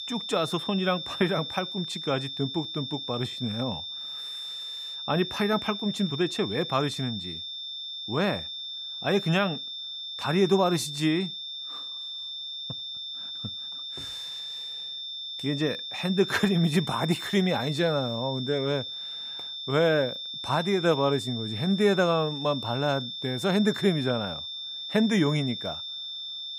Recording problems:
high-pitched whine; loud; throughout; 3.5 kHz, 6 dB below the speech

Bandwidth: 15.5 kHz